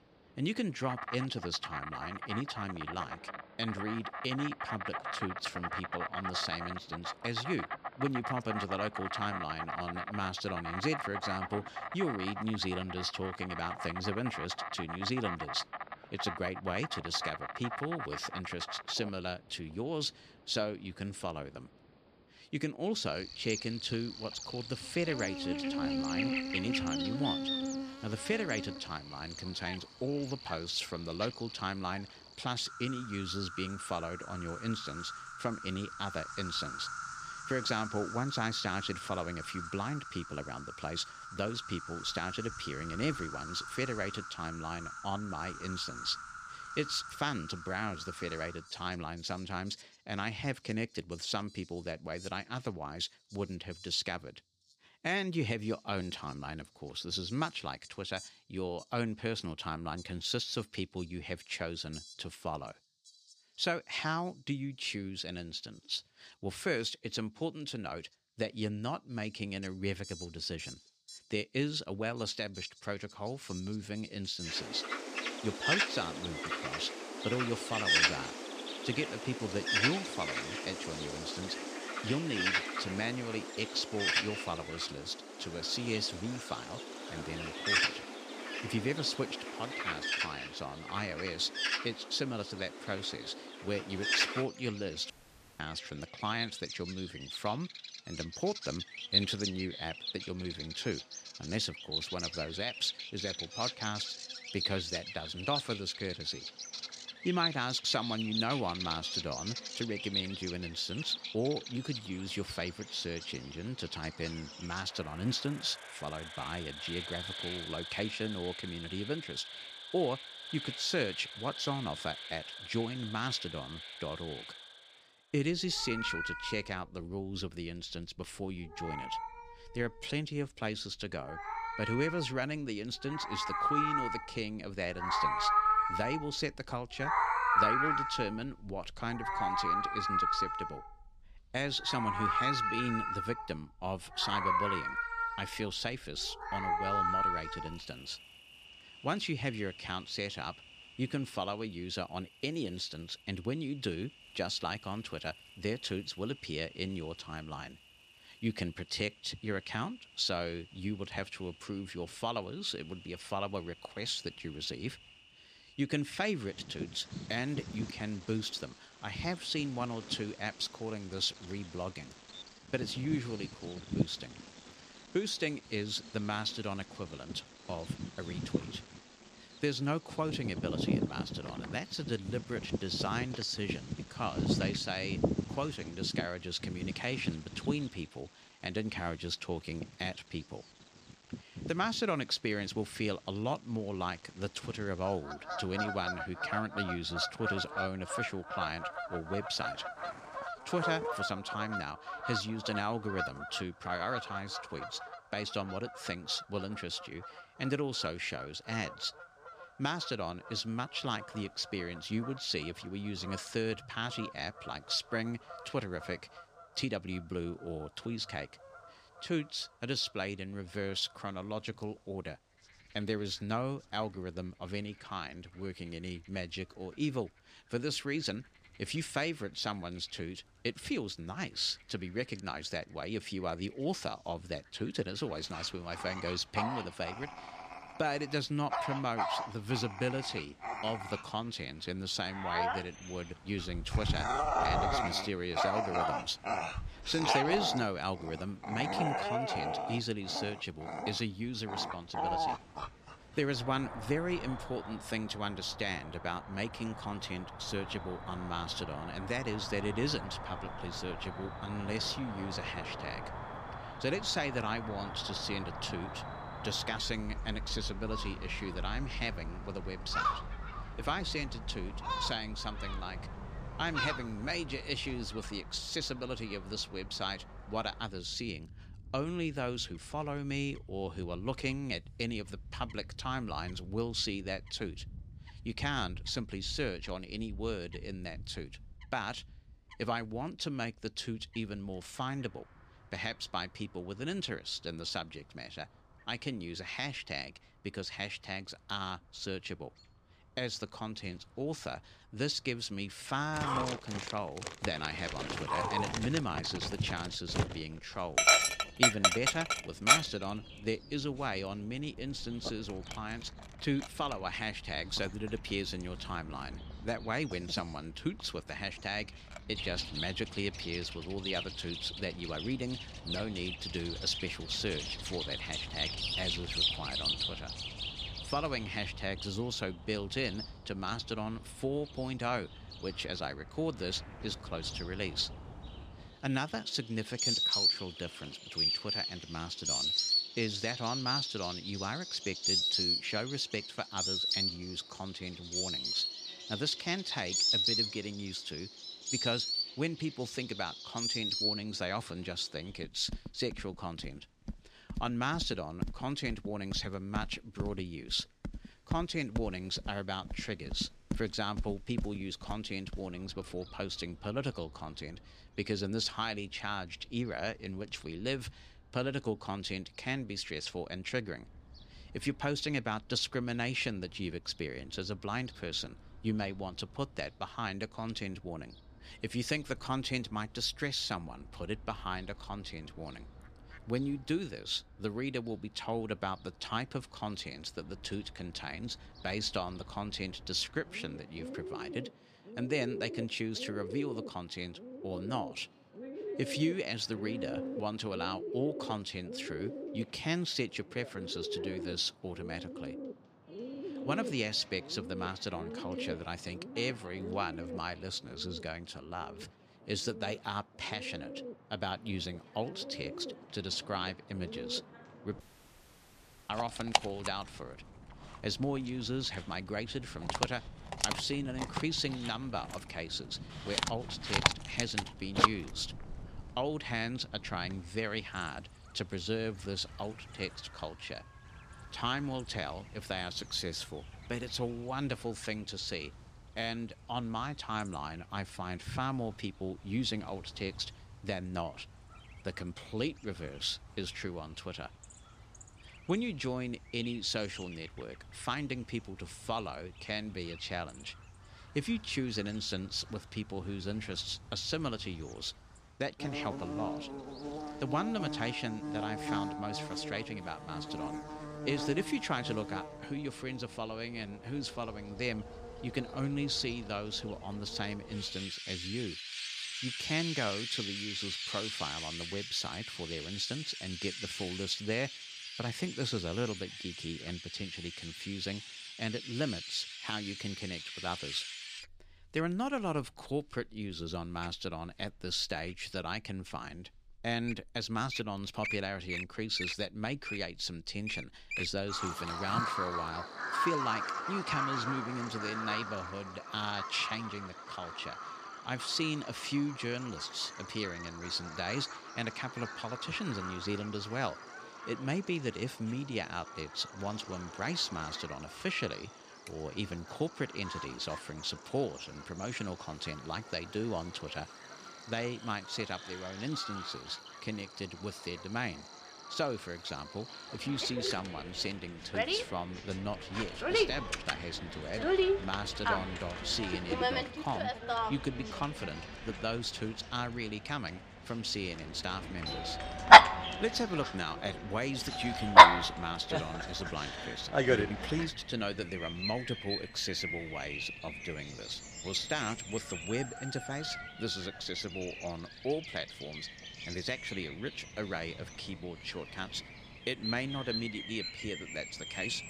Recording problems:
animal sounds; very loud; throughout; 1 dB above the speech
audio cutting out; at 1:35 and at 6:56 for 1 s

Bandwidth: 14.5 kHz